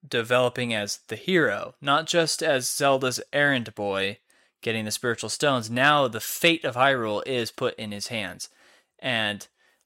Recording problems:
none

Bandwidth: 16 kHz